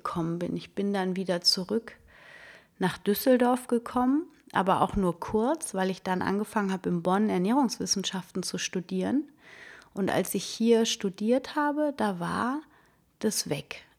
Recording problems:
none

